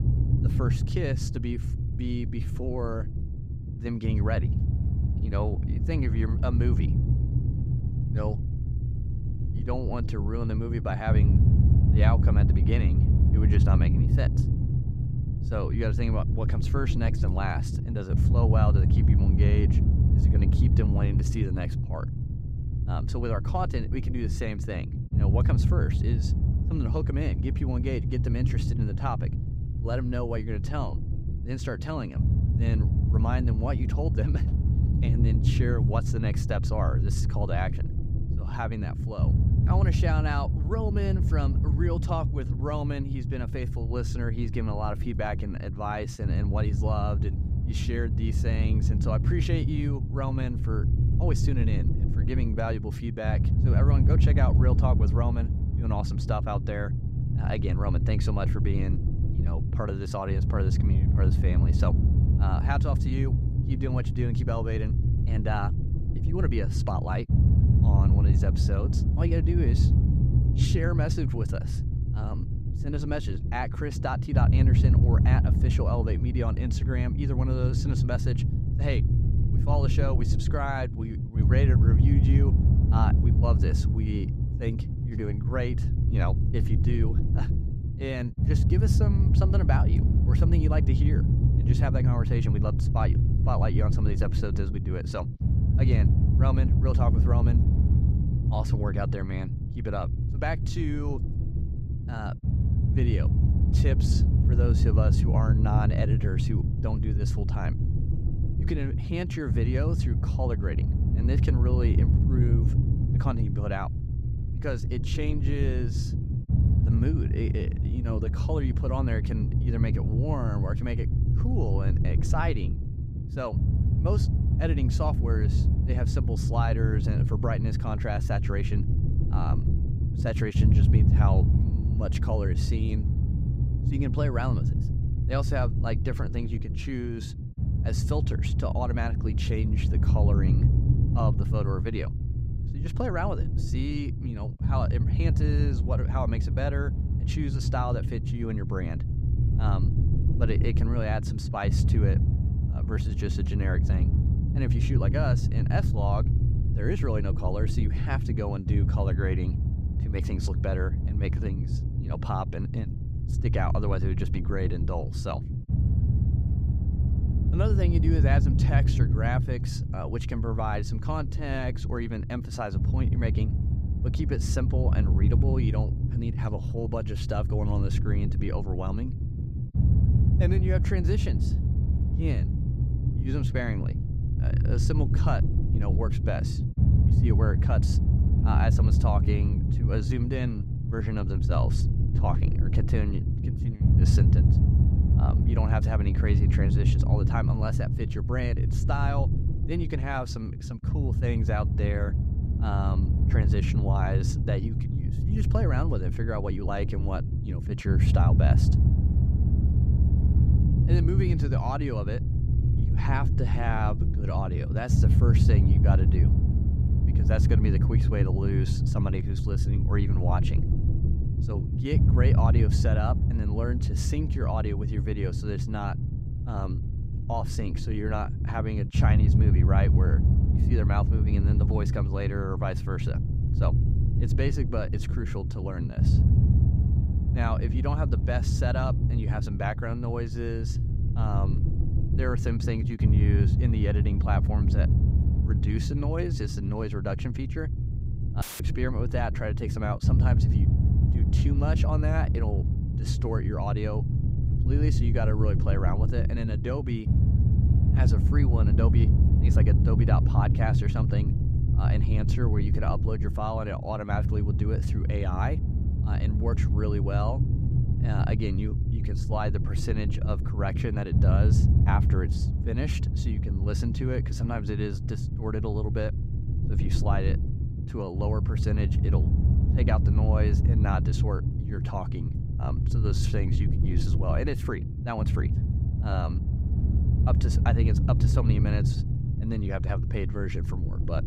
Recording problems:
low rumble; loud; throughout; 4 dB below the speech
audio cutting out; filled with static; at 4:08

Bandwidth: 15.5 kHz